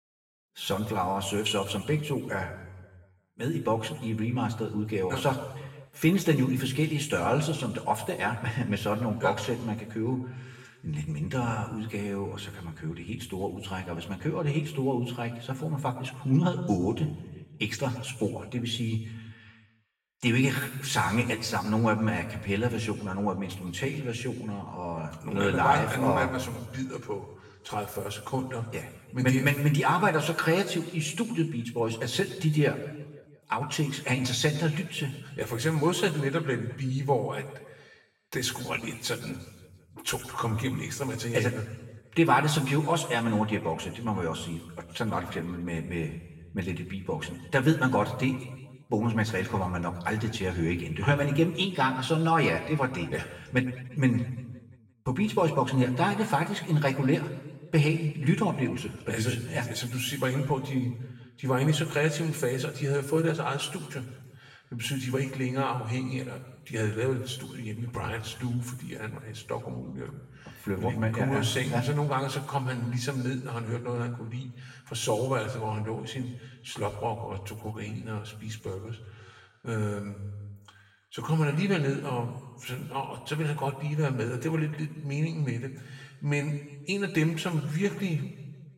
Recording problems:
off-mic speech; far
room echo; noticeable; dies away in 1.2 s

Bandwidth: 16 kHz